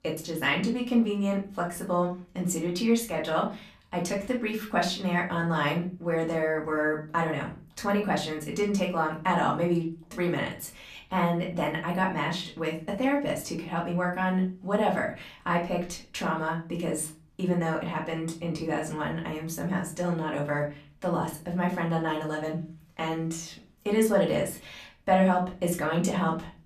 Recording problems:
off-mic speech; far
room echo; slight; dies away in 0.3 s

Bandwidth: 14.5 kHz